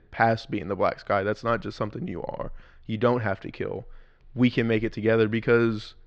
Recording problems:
muffled; slightly; fading above 4 kHz

